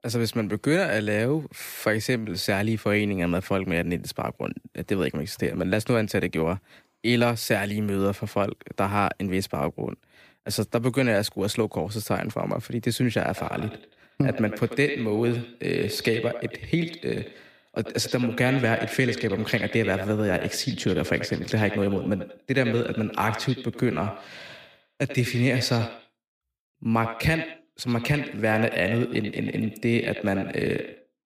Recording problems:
echo of what is said; strong; from 13 s on; 90 ms later, 10 dB below the speech

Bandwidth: 15 kHz